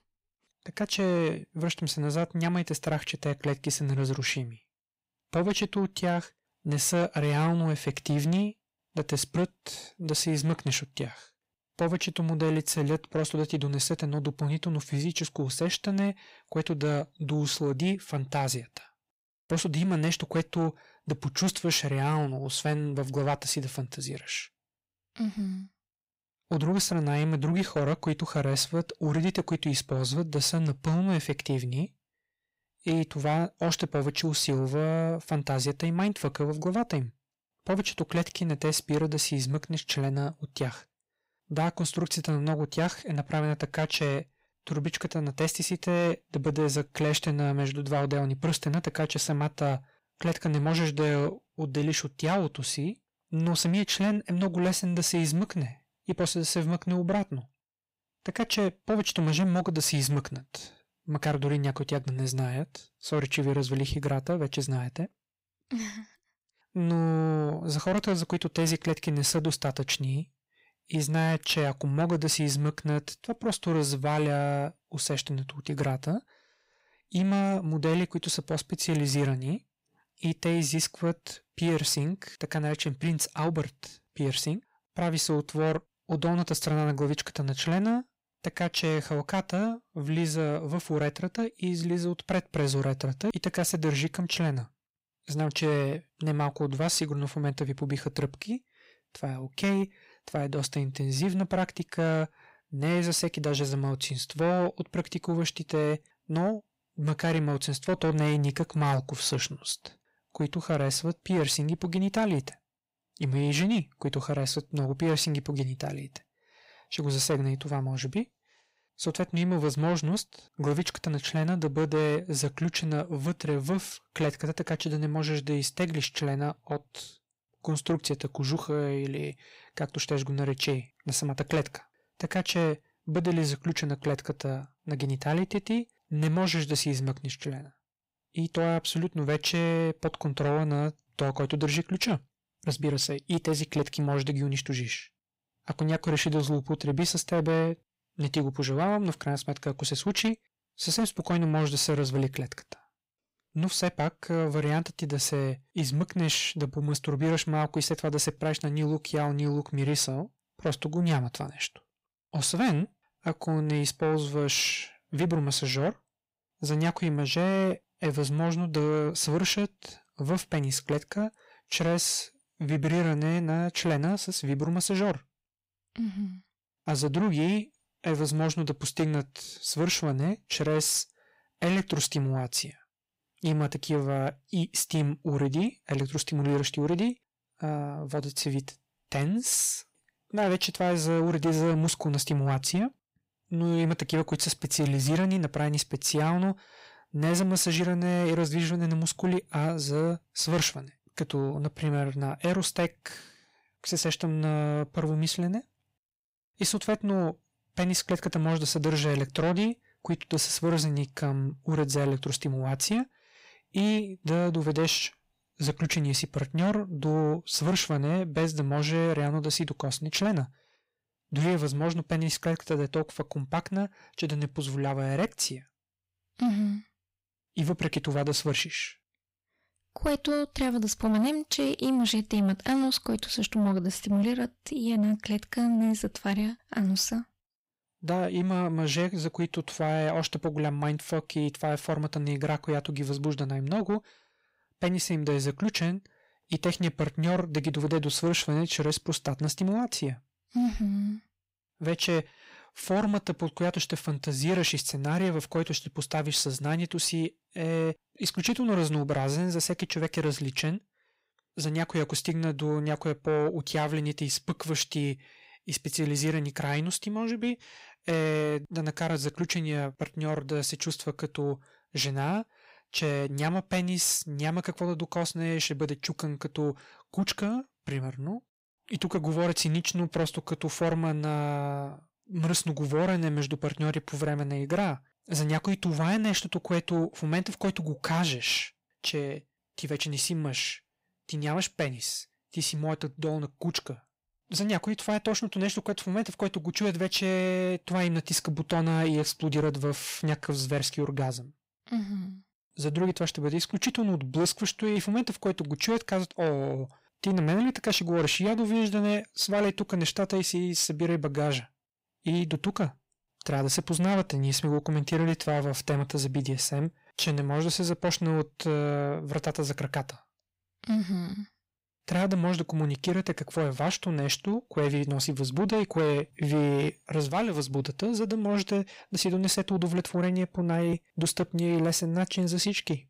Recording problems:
distortion; slight; 10 dB below the speech

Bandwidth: 15.5 kHz